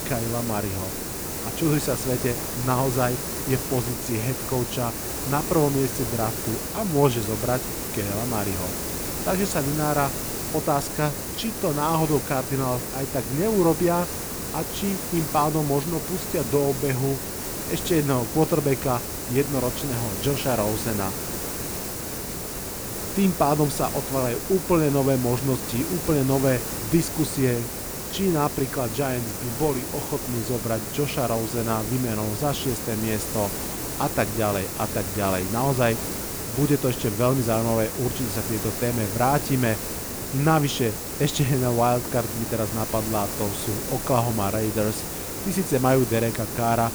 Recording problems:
hiss; loud; throughout; 4 dB below the speech

